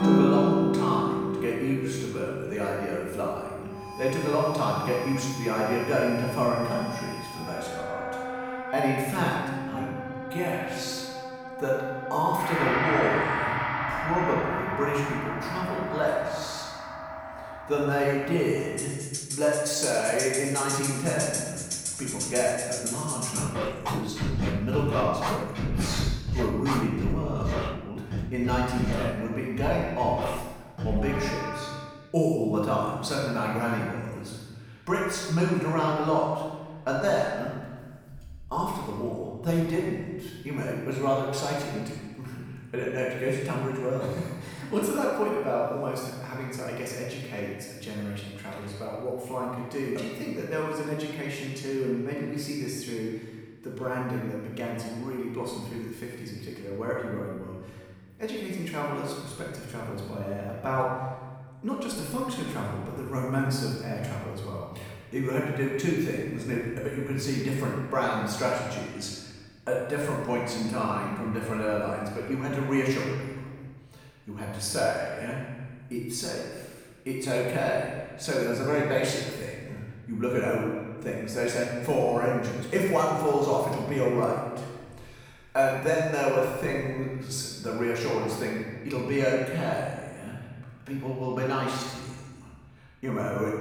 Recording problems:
room echo; strong; dies away in 1.4 s
off-mic speech; far
background music; loud; until 32 s; 2 dB below the speech

